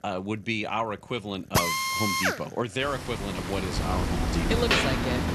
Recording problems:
machinery noise; very loud; throughout; 4 dB above the speech

